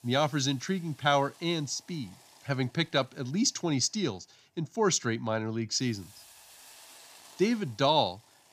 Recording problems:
hiss; faint; throughout; 25 dB below the speech

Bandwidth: 15 kHz